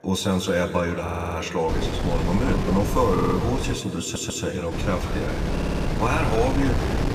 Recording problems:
room echo; slight; dies away in 2 s
off-mic speech; somewhat distant
wind noise on the microphone; heavy; from 1.5 to 4 s and from 4.5 s on; 6 dB below the speech
background chatter; faint; throughout; 2 voices, 25 dB below the speech
audio stuttering; 4 times, first at 1 s

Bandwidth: 15 kHz